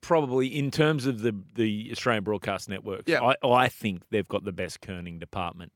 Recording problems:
none

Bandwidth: 17.5 kHz